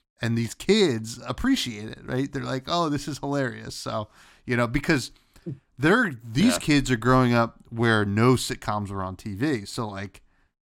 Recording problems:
none

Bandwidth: 16.5 kHz